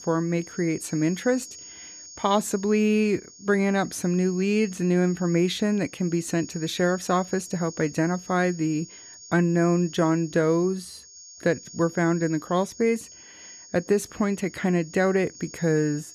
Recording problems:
high-pitched whine; noticeable; throughout; 6.5 kHz, 15 dB below the speech

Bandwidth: 14 kHz